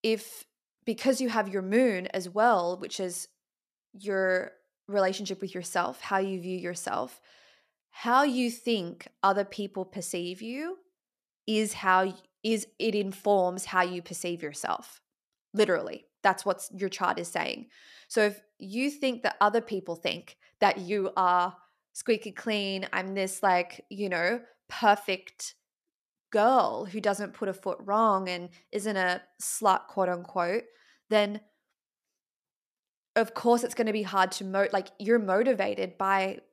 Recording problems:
none

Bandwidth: 14.5 kHz